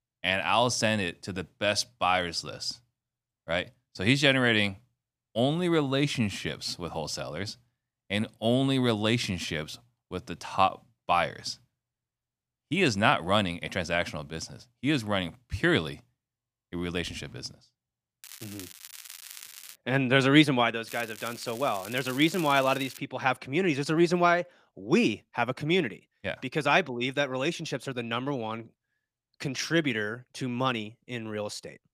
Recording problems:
crackling; noticeable; from 18 to 20 s and from 21 to 23 s; 15 dB below the speech

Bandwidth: 15 kHz